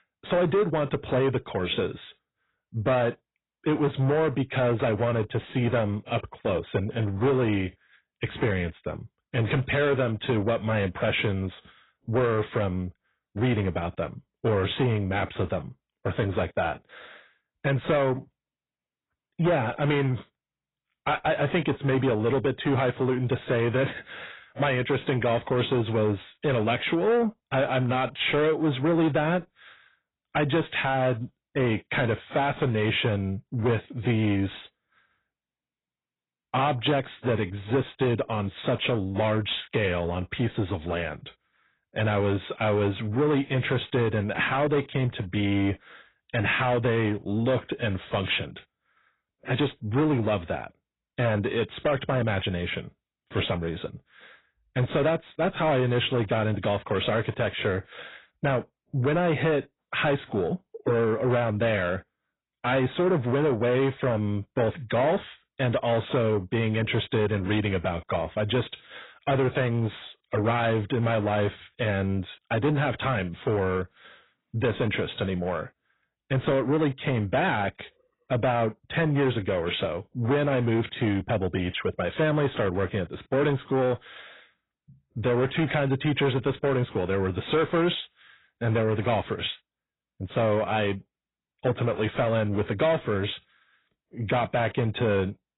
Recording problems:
garbled, watery; badly; nothing above 4 kHz
distortion; slight; 10 dB below the speech

